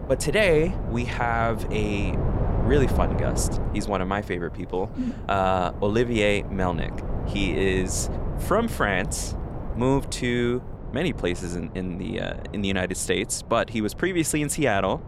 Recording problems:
wind noise on the microphone; occasional gusts; 10 dB below the speech

